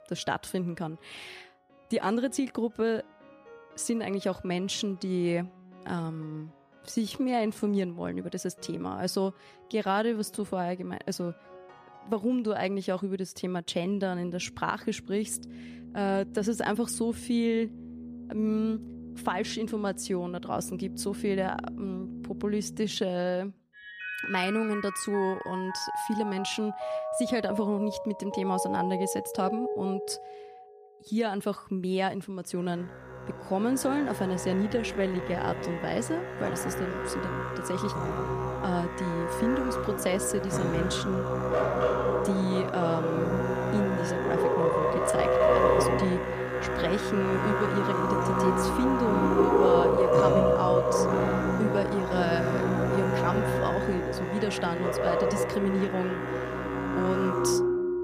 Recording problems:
background music; very loud; throughout; 2 dB above the speech
uneven, jittery; strongly; from 6.5 to 46 s

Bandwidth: 14.5 kHz